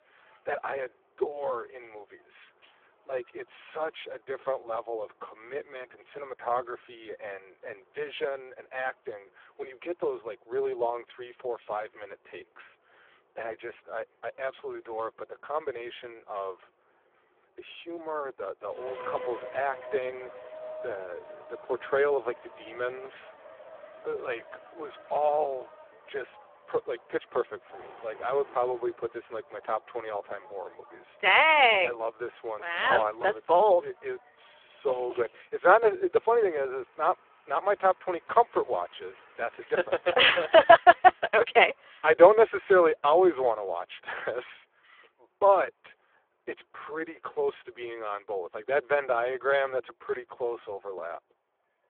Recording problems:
phone-call audio; poor line
traffic noise; faint; throughout; 20 dB below the speech
jangling keys; very faint; at 2.5 s; peak 35 dB below the speech

